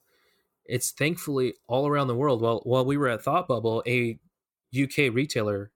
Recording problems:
none

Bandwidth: 18 kHz